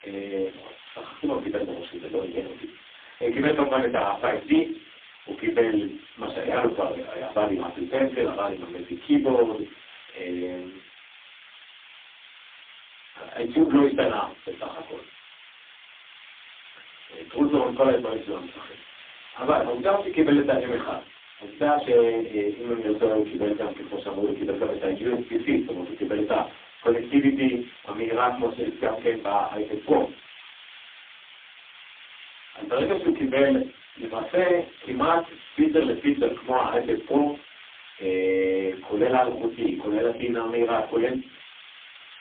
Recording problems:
phone-call audio; poor line
off-mic speech; far
room echo; slight; dies away in 0.3 s
distortion; slight; 15 dB below the speech
hiss; faint; throughout; 20 dB below the speech

